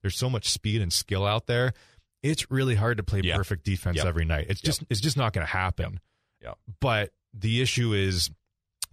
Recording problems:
none

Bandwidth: 14.5 kHz